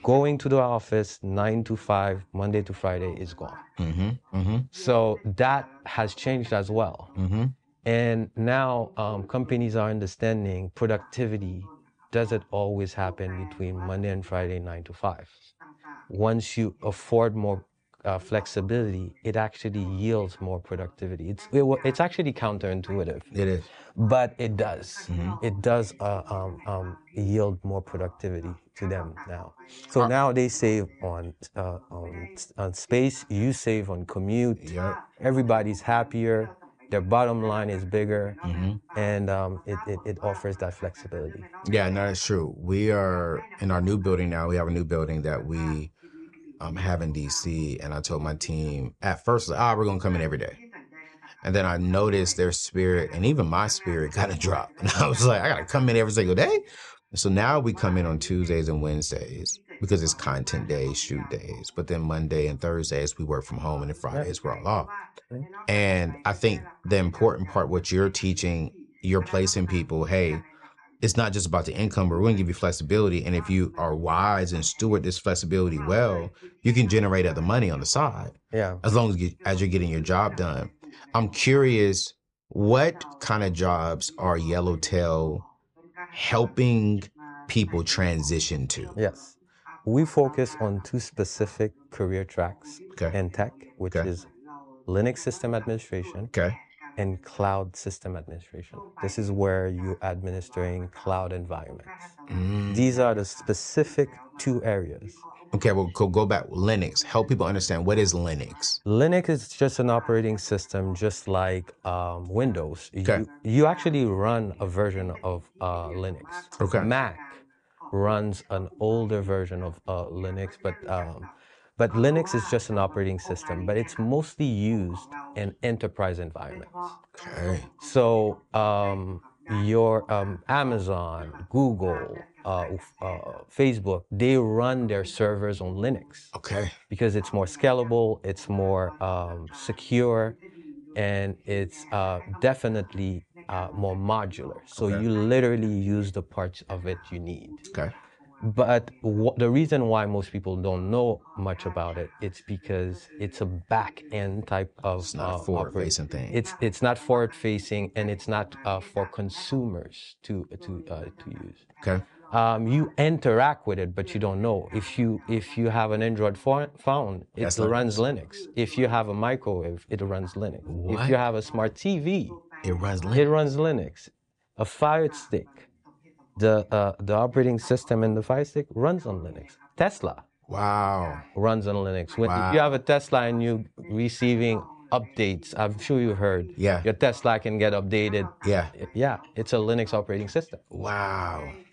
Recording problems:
voice in the background; faint; throughout; 20 dB below the speech

